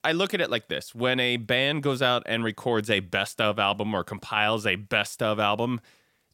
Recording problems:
none

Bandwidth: 16.5 kHz